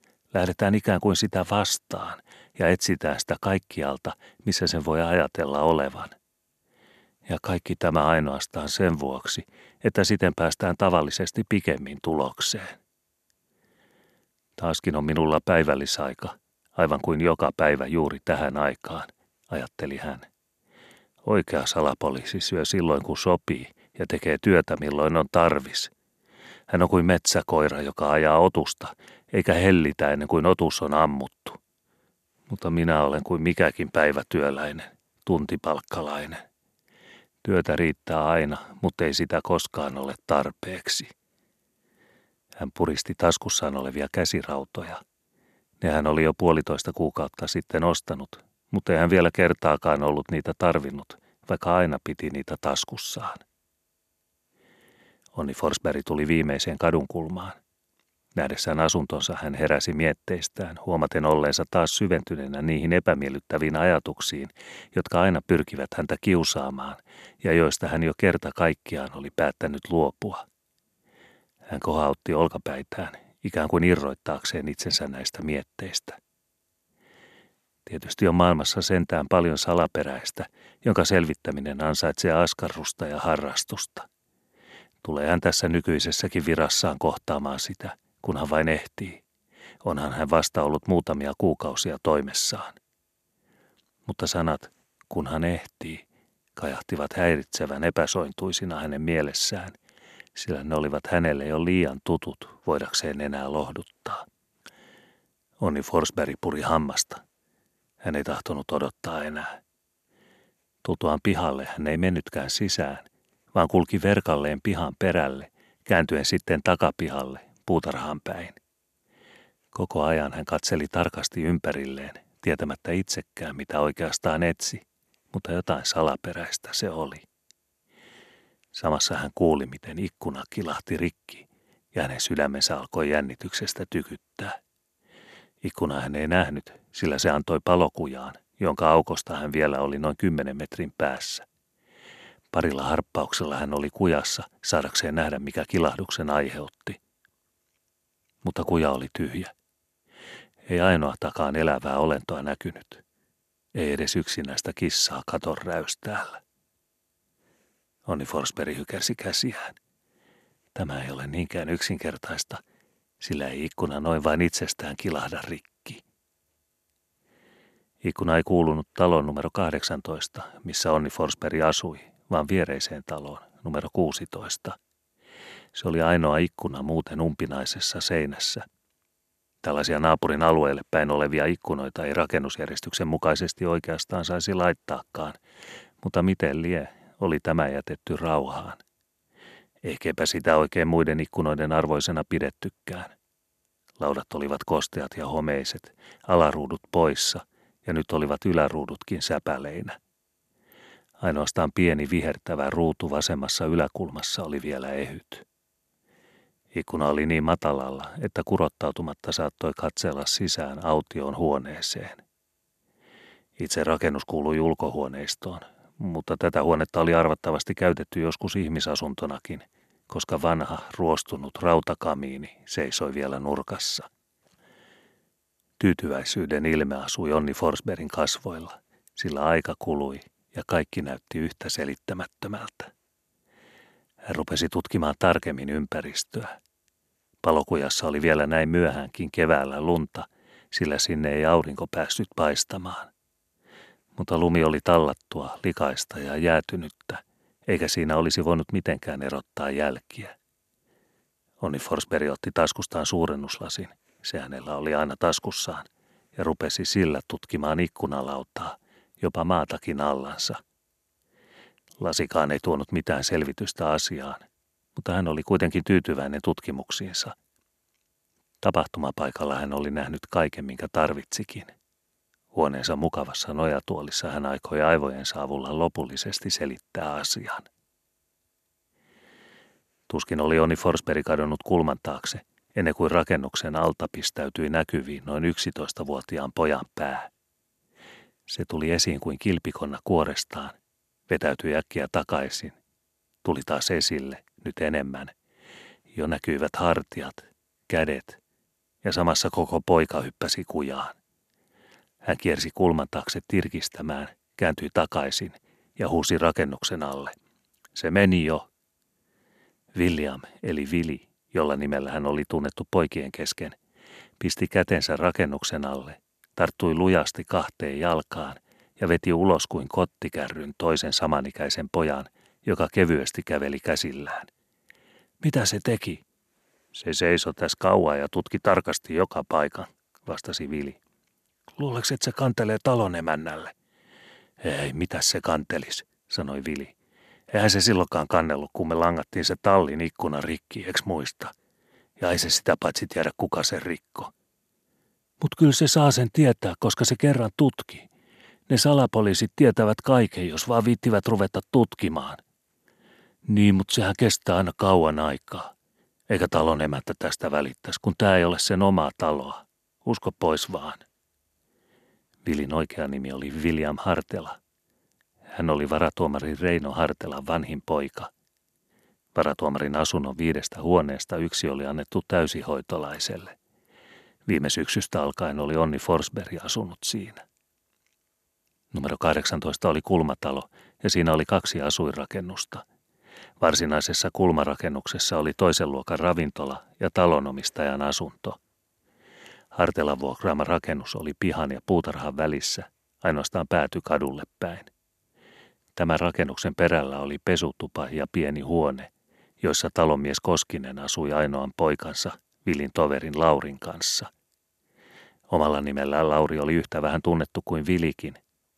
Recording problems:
none

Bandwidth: 13.5 kHz